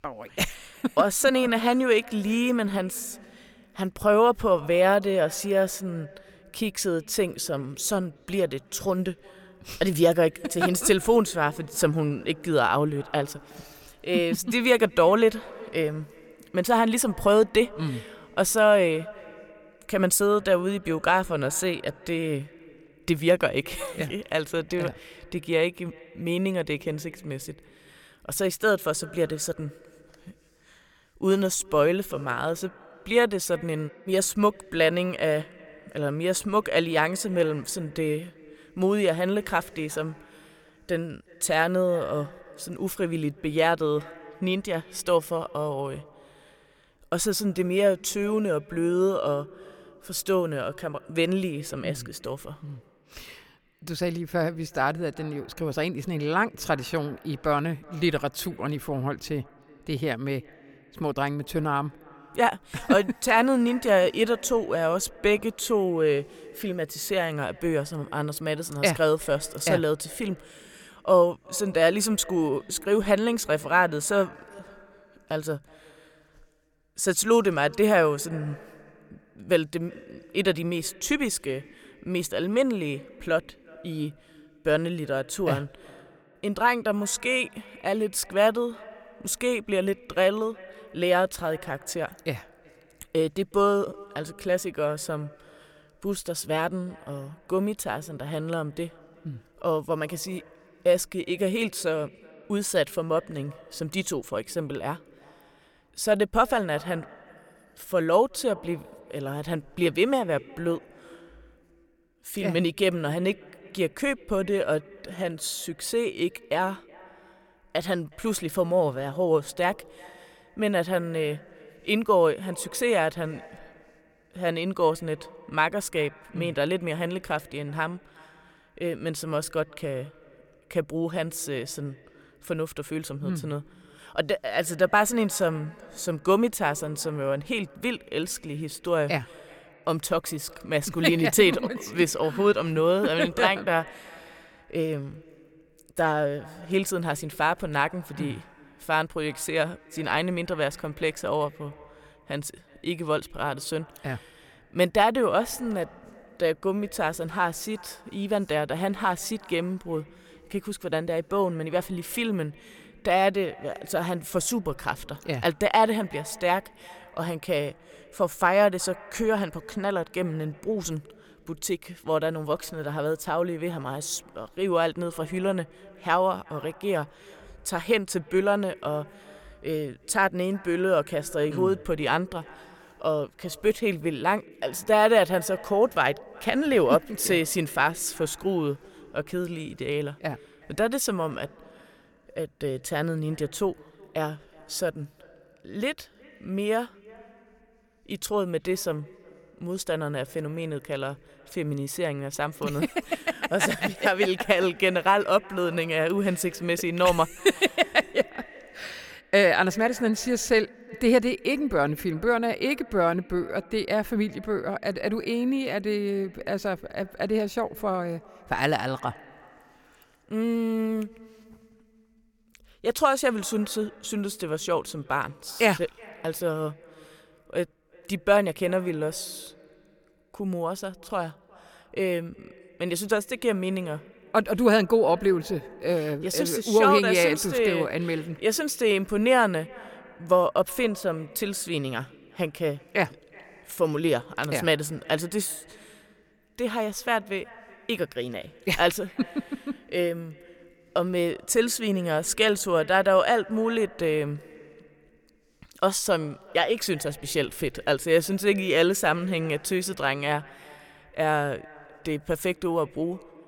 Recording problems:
echo of what is said; faint; throughout; 370 ms later, 25 dB below the speech

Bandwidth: 17 kHz